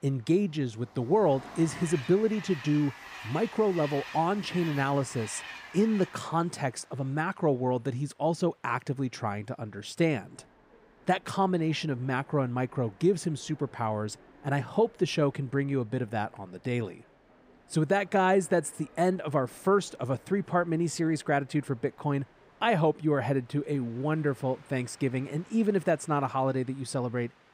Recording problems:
train or aircraft noise; noticeable; throughout; 20 dB below the speech

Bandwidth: 15.5 kHz